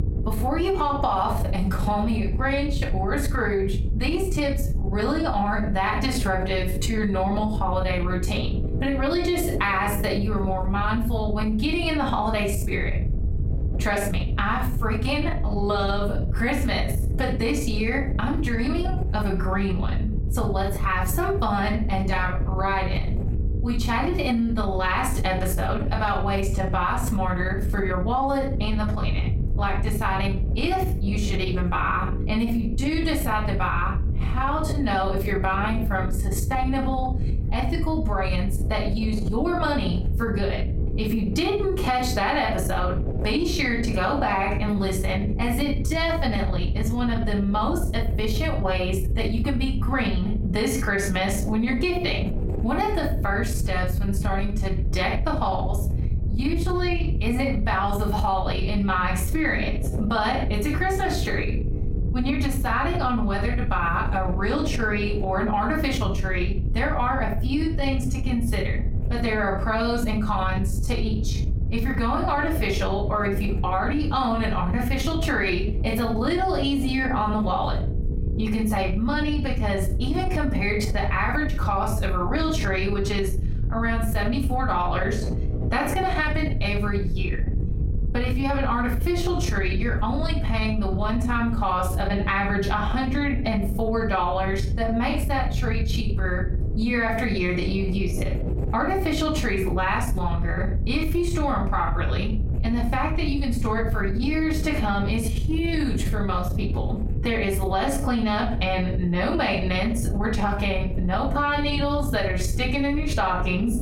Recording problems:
off-mic speech; far
room echo; slight; dies away in 0.3 s
squashed, flat; somewhat
electrical hum; noticeable; throughout; 60 Hz, 20 dB below the speech
wind noise on the microphone; occasional gusts; 20 dB below the speech

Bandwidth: 16 kHz